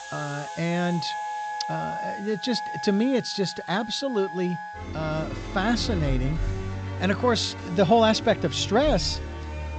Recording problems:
high frequencies cut off; noticeable; nothing above 8 kHz
background music; loud; throughout; 8 dB below the speech
hiss; faint; throughout; 25 dB below the speech

